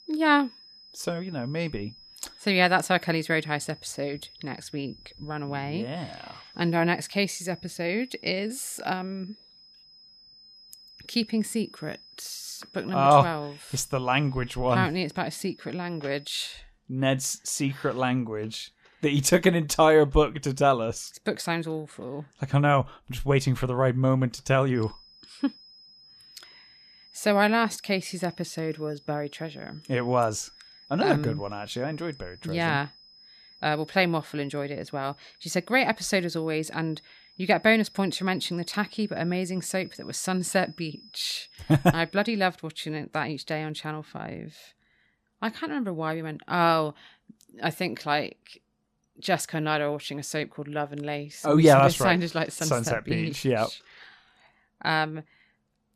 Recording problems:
high-pitched whine; faint; until 17 s and from 25 to 42 s; 5 kHz, 25 dB below the speech

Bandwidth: 14.5 kHz